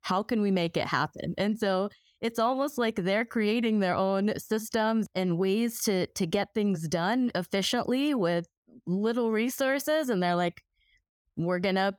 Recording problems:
none

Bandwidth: 18 kHz